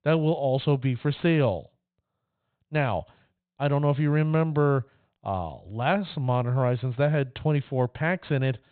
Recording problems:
high frequencies cut off; severe; nothing above 4 kHz

